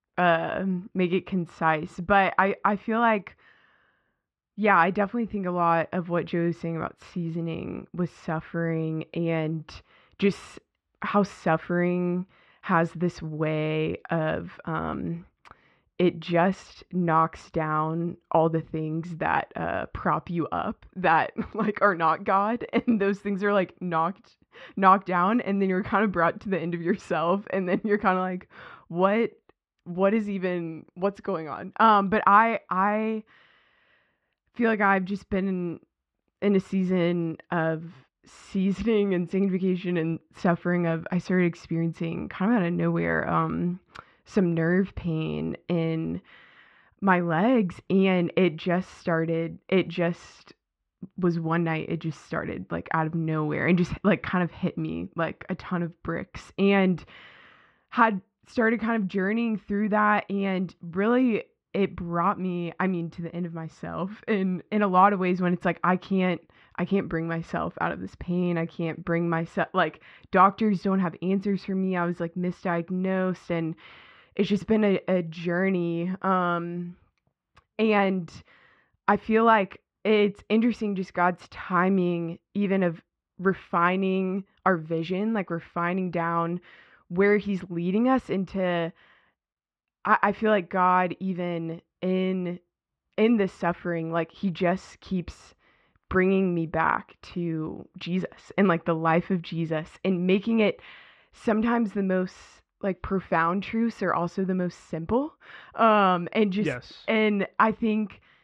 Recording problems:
muffled; very; fading above 3 kHz

